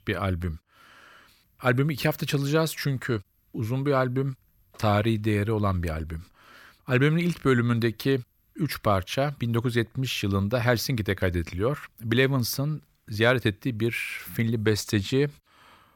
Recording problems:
none

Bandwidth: 17.5 kHz